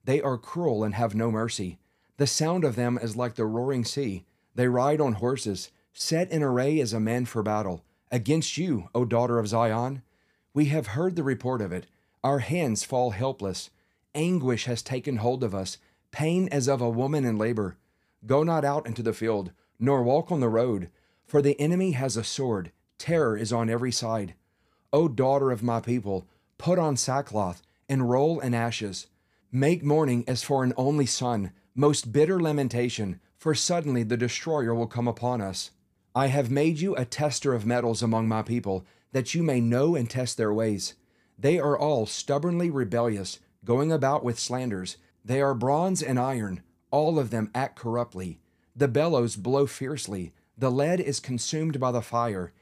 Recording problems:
none

